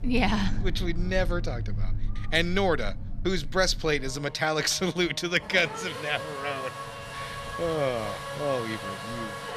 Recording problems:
traffic noise; loud; throughout; 8 dB below the speech

